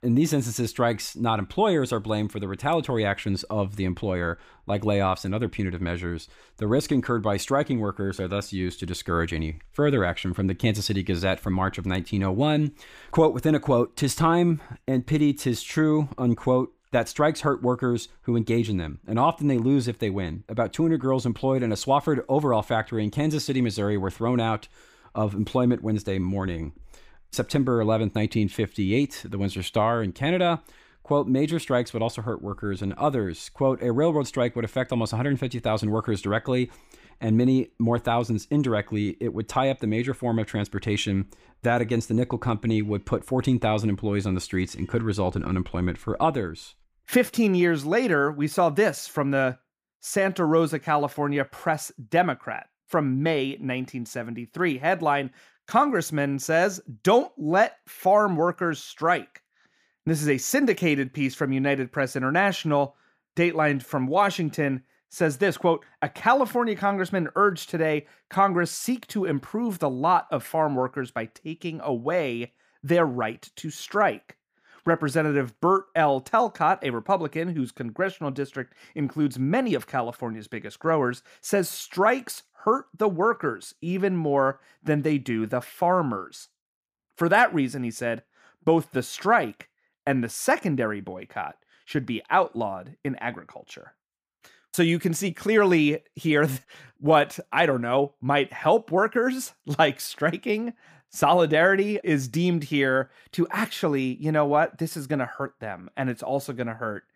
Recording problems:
none

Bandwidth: 15 kHz